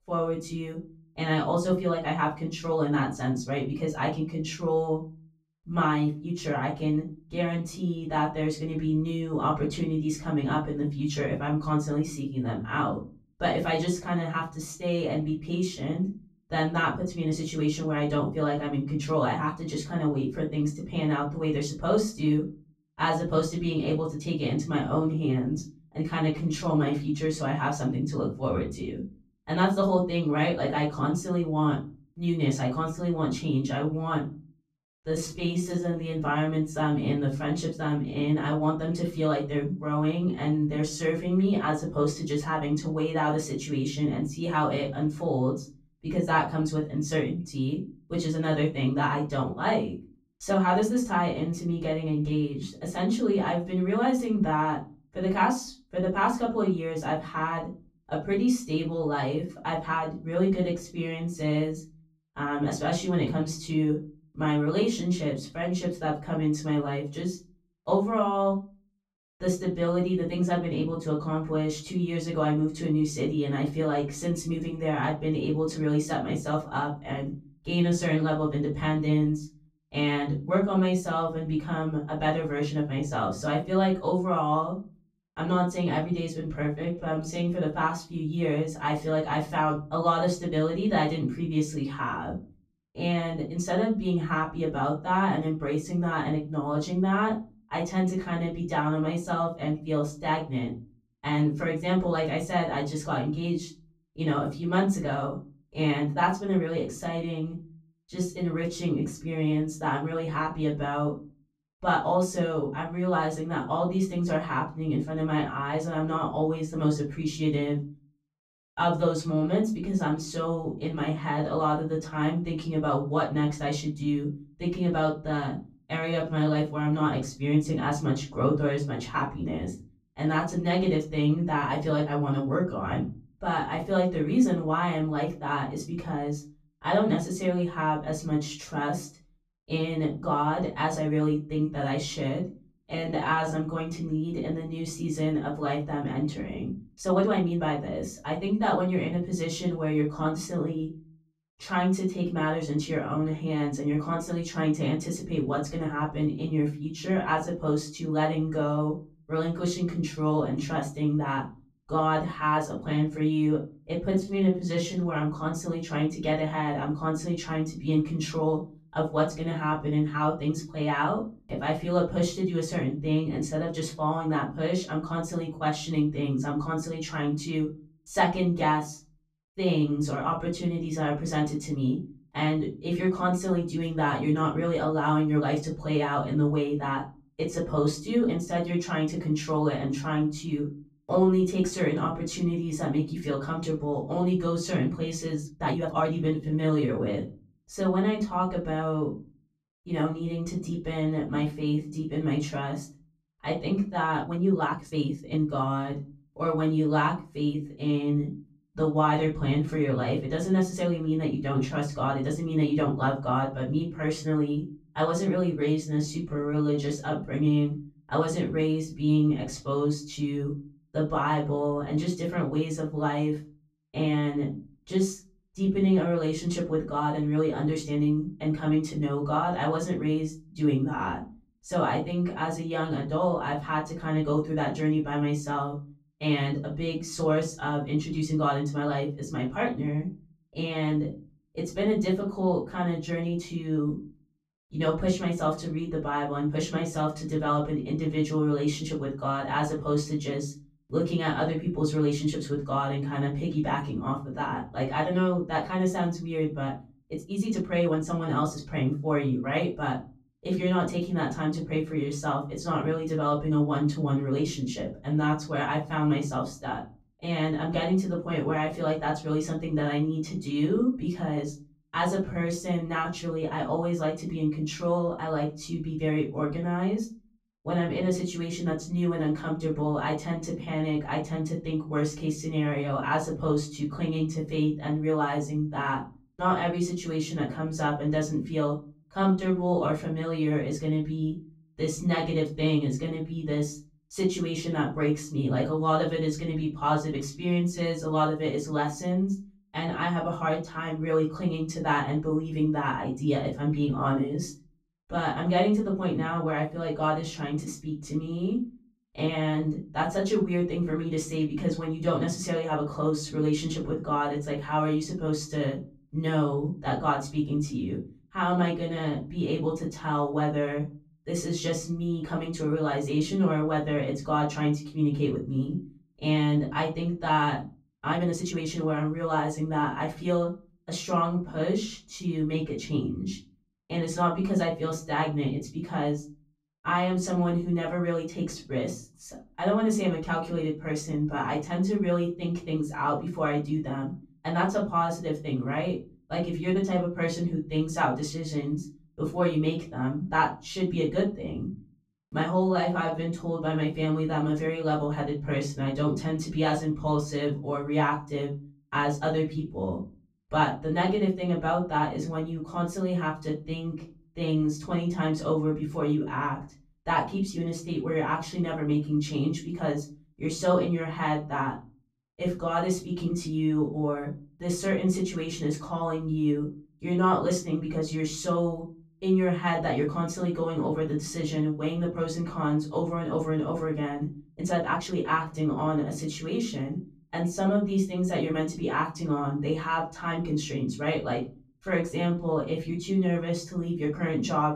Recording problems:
off-mic speech; far
room echo; slight; dies away in 0.4 s
uneven, jittery; strongly; from 26 s to 6:33

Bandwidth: 14.5 kHz